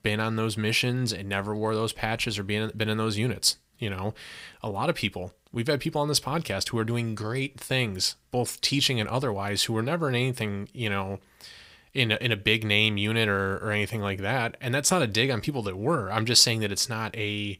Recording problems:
none

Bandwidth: 15.5 kHz